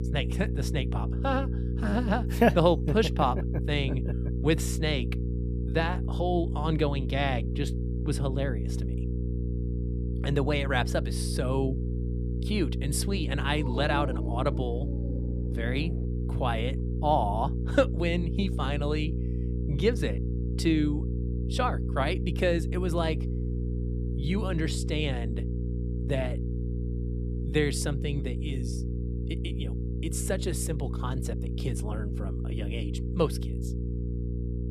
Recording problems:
electrical hum; noticeable; throughout; 60 Hz, 10 dB below the speech
dog barking; noticeable; from 14 to 16 s; peak 5 dB below the speech

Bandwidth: 14.5 kHz